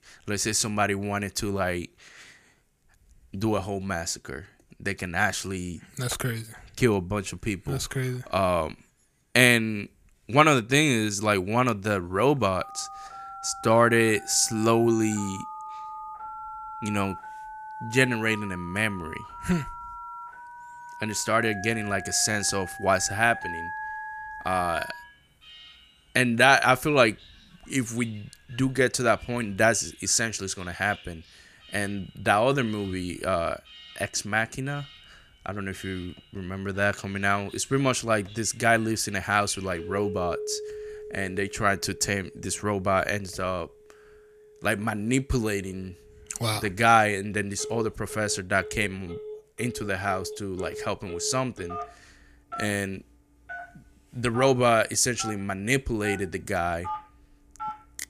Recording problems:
alarms or sirens; noticeable; from 13 s on; 15 dB below the speech

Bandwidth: 15 kHz